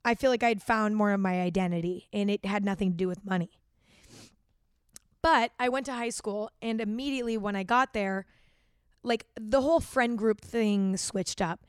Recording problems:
none

